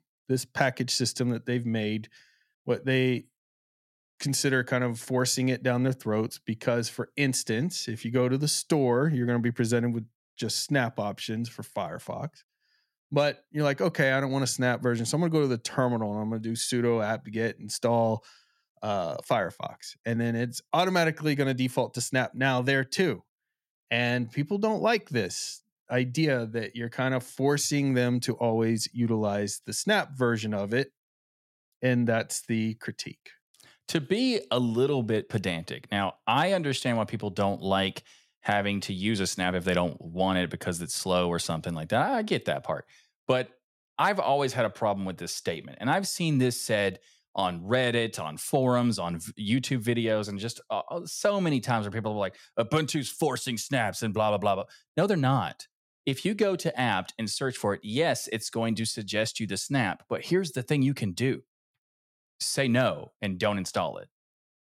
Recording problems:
none

